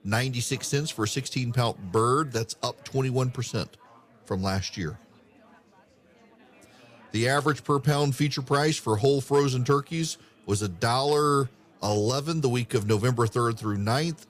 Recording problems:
murmuring crowd; faint; throughout; 30 dB below the speech

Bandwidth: 14.5 kHz